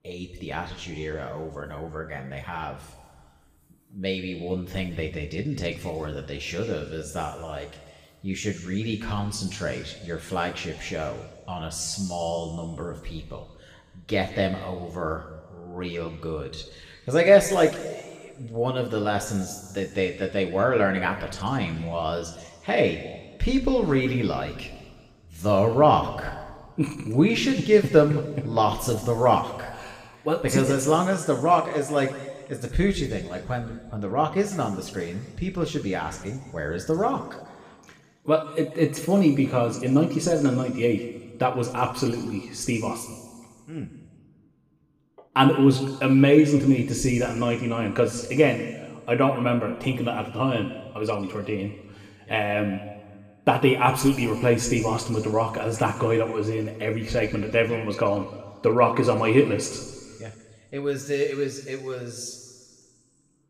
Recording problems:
room echo; slight; dies away in 1.6 s
off-mic speech; somewhat distant

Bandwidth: 15 kHz